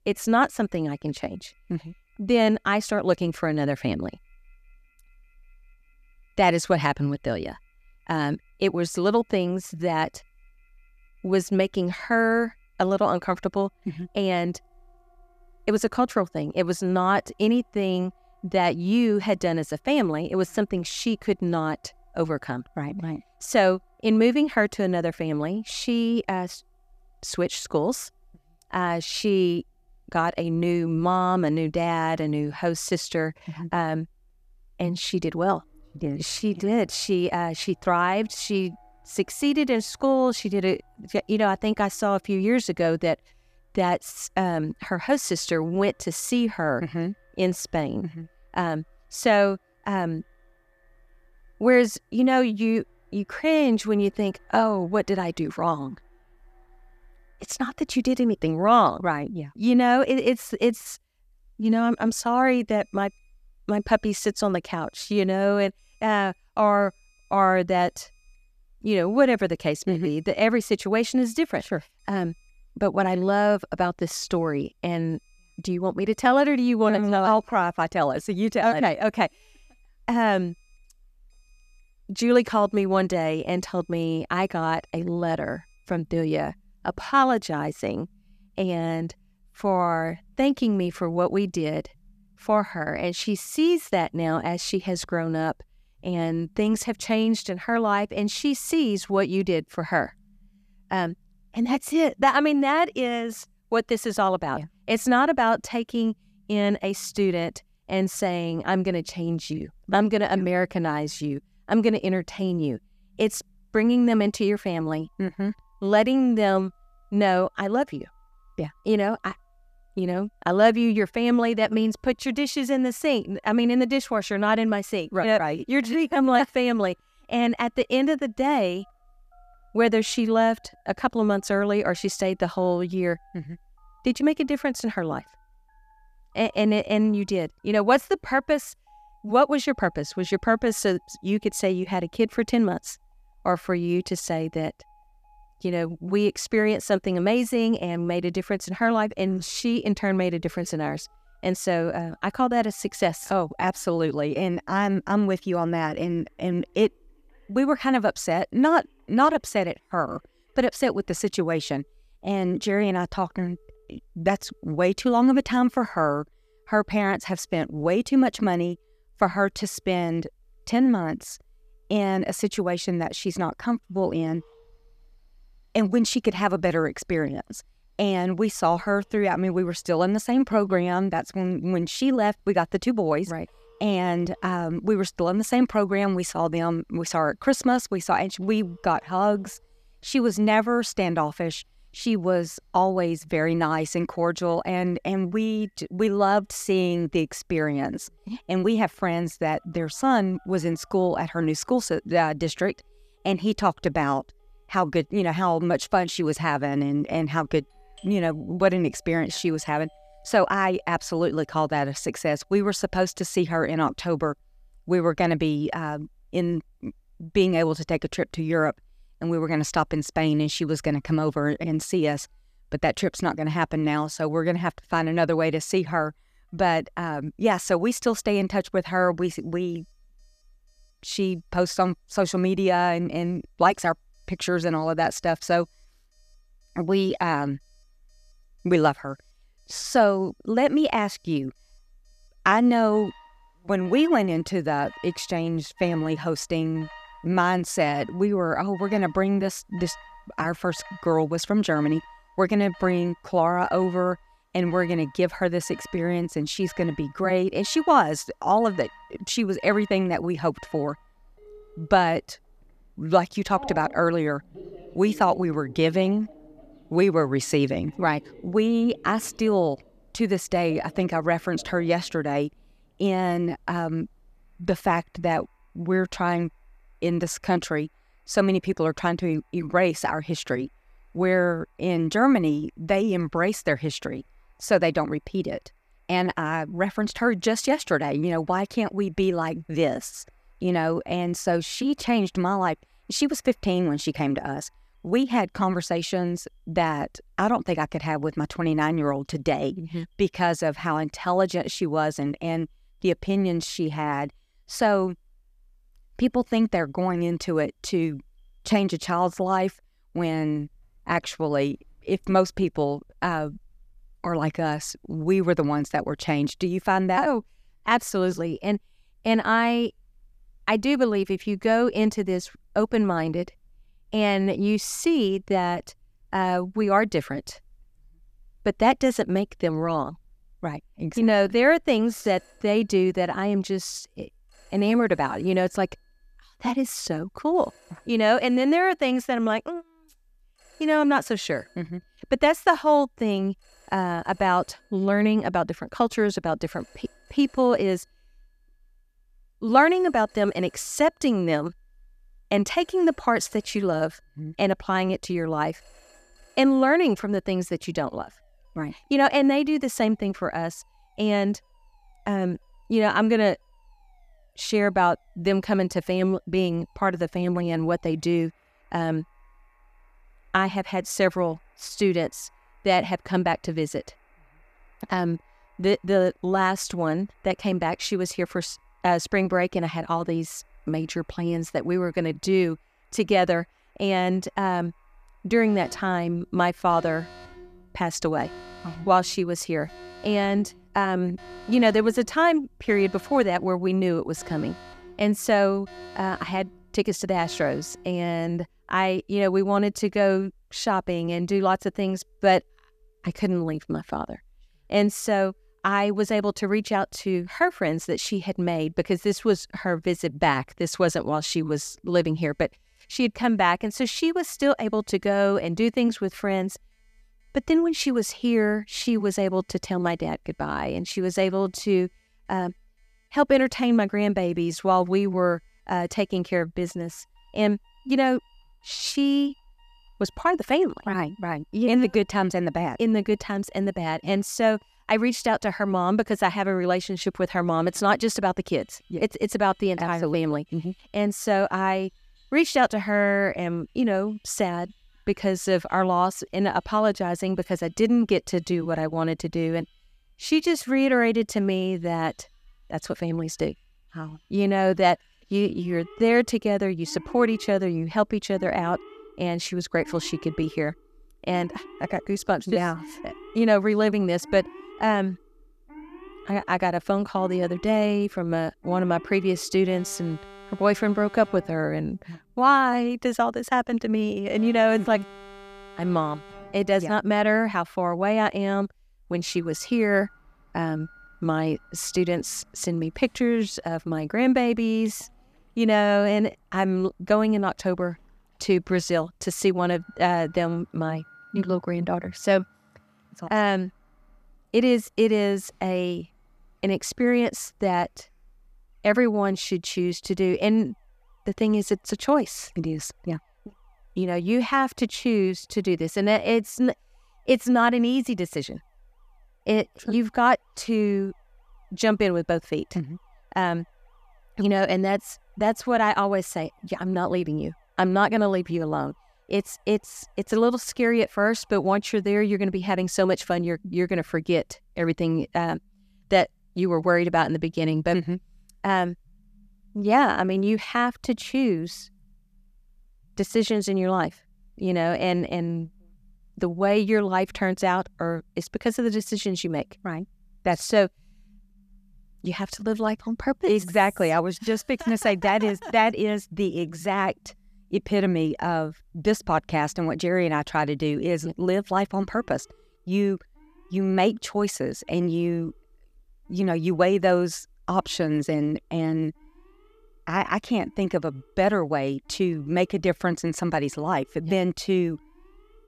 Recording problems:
alarms or sirens; faint; throughout; 30 dB below the speech

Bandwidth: 14.5 kHz